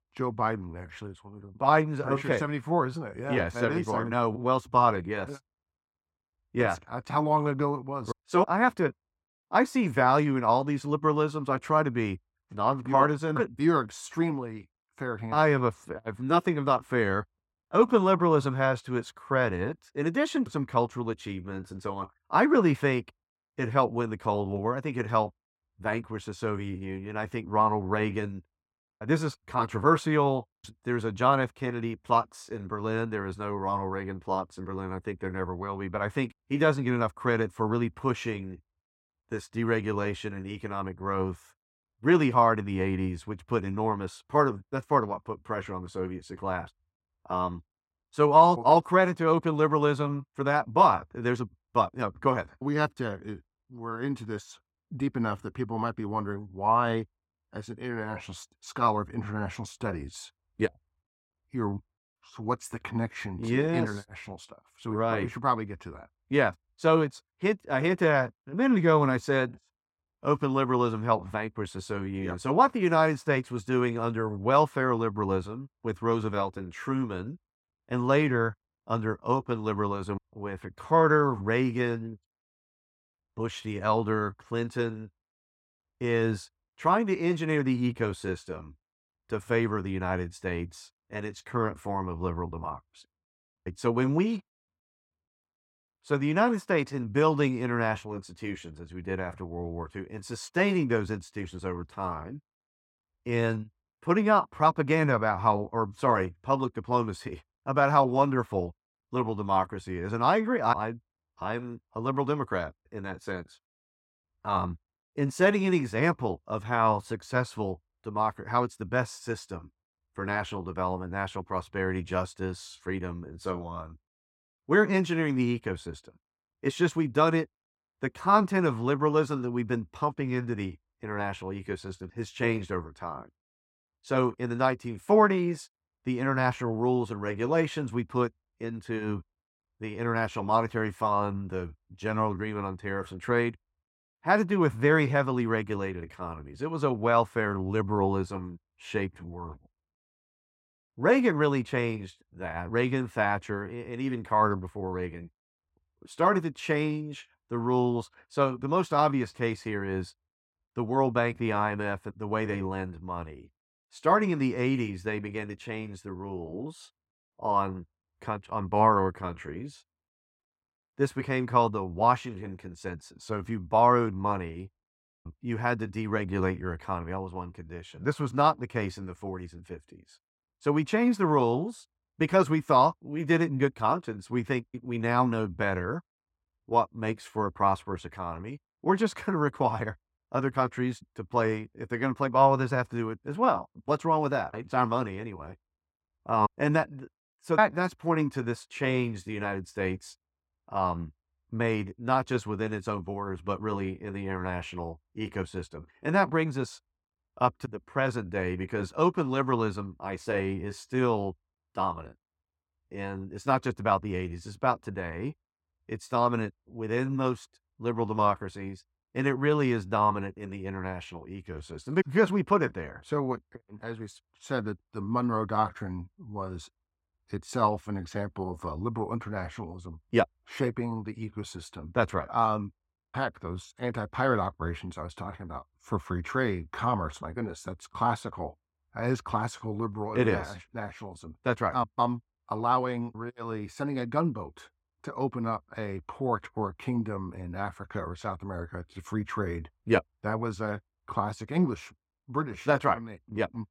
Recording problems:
muffled; slightly; fading above 2.5 kHz

